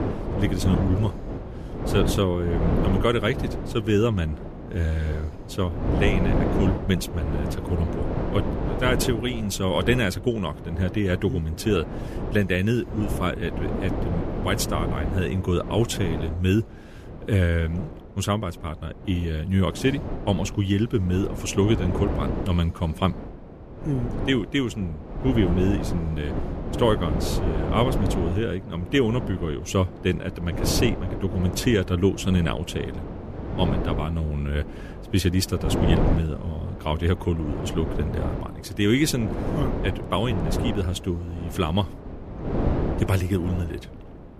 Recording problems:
wind noise on the microphone; heavy; 6 dB below the speech

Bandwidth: 14.5 kHz